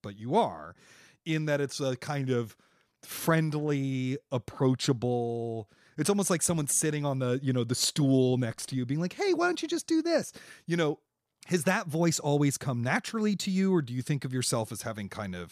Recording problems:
none

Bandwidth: 14.5 kHz